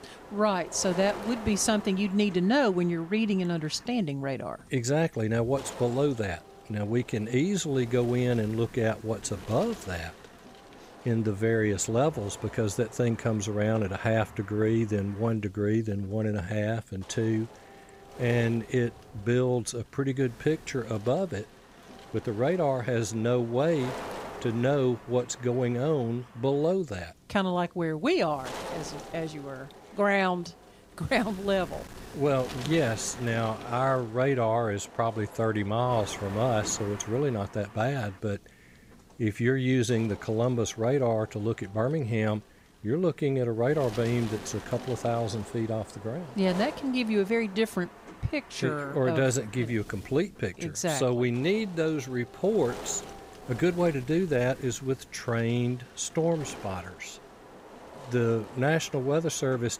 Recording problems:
wind noise on the microphone; occasional gusts; 15 dB below the speech

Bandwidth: 15.5 kHz